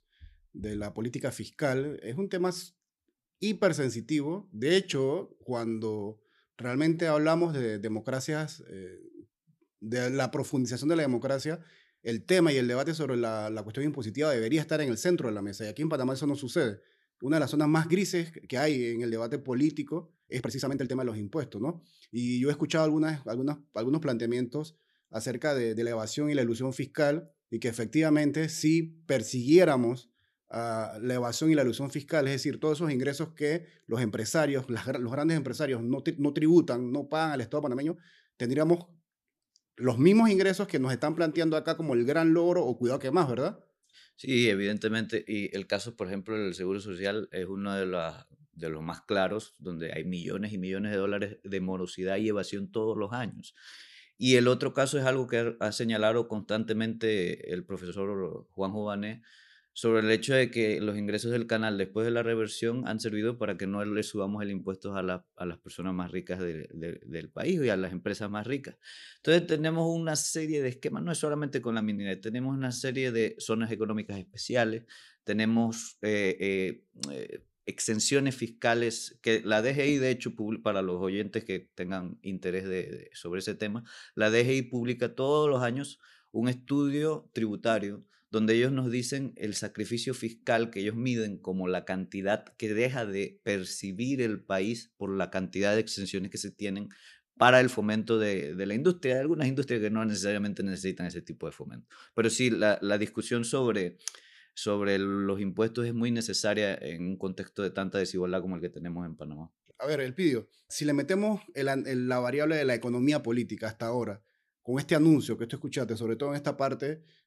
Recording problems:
uneven, jittery; strongly; from 4.5 s to 1:34

